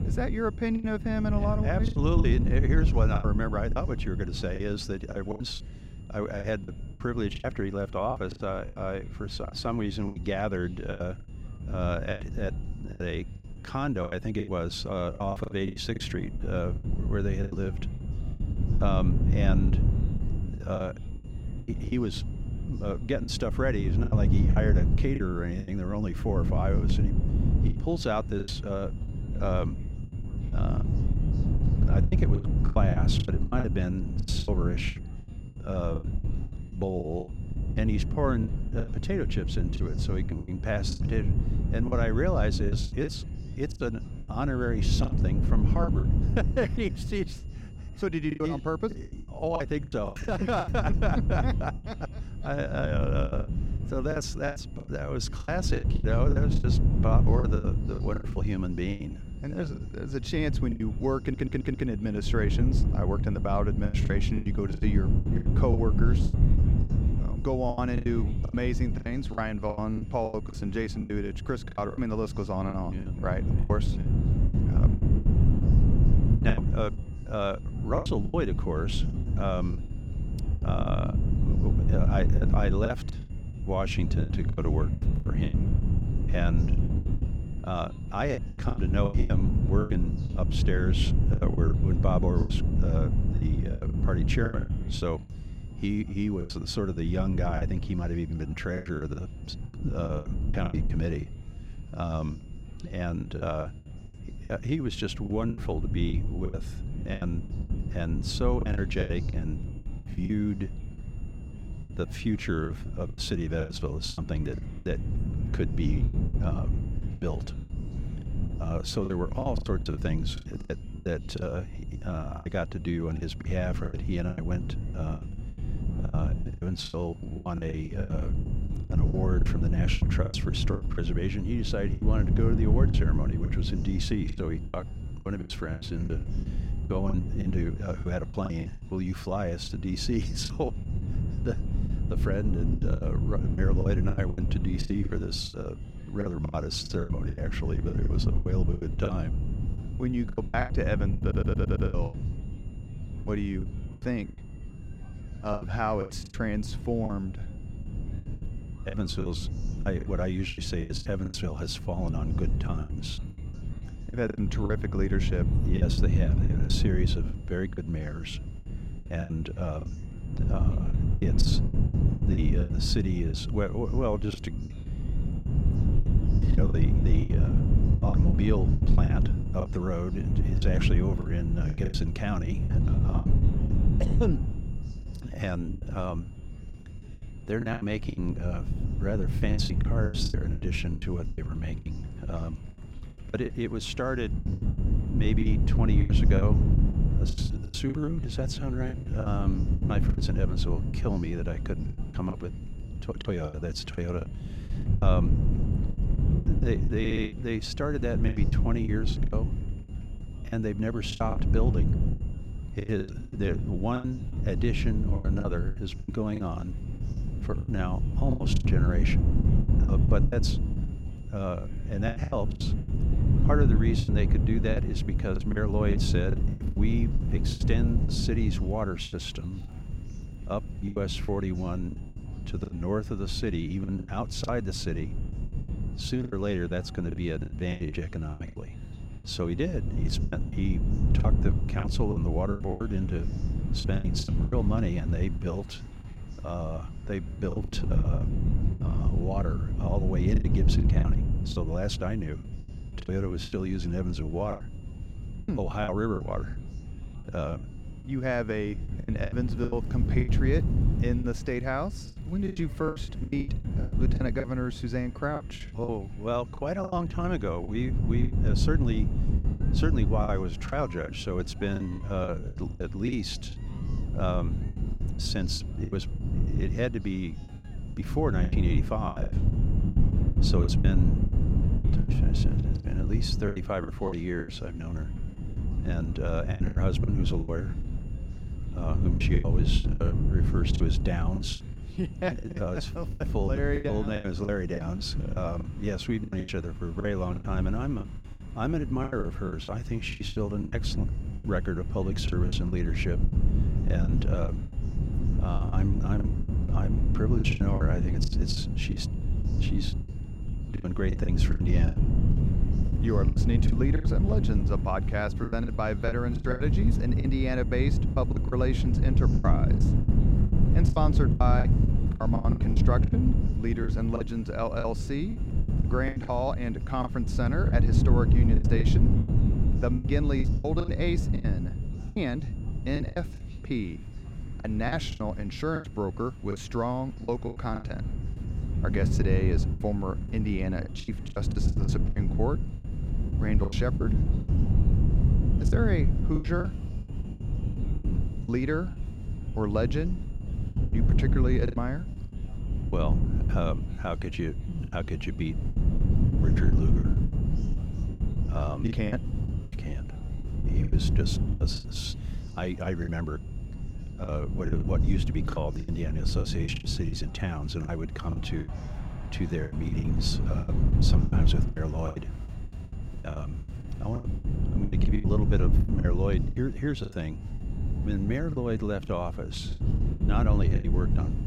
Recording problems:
wind noise on the microphone; heavy; 7 dB below the speech
high-pitched whine; faint; throughout; 3 kHz, 30 dB below the speech
murmuring crowd; faint; throughout; 25 dB below the speech
choppy; very; 13% of the speech affected
audio stuttering; at 1:01, at 2:31 and at 3:27

